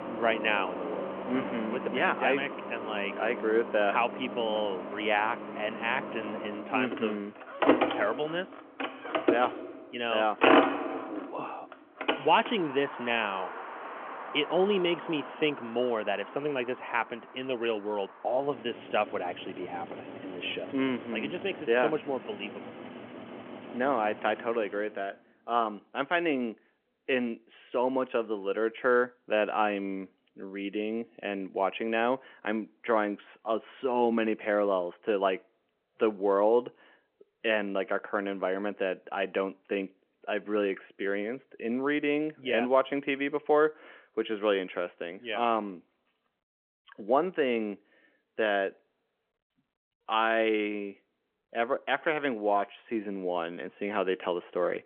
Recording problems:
phone-call audio; nothing above 3 kHz
traffic noise; loud; until 25 s; 4 dB below the speech

